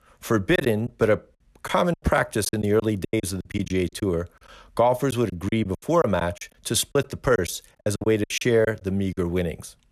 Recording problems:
choppy; very; 13% of the speech affected

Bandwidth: 14.5 kHz